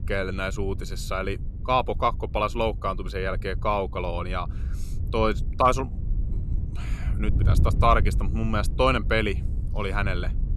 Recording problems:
wind noise on the microphone; occasional gusts; 20 dB below the speech

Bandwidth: 13.5 kHz